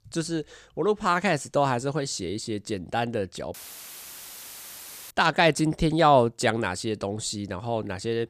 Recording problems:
audio cutting out; filled with static; at 3.5 s for 1.5 s

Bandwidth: 14.5 kHz